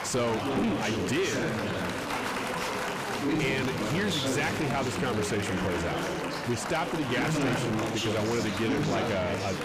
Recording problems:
distortion; heavy; 7 dB below the speech
chatter from many people; loud; throughout; as loud as the speech

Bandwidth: 15 kHz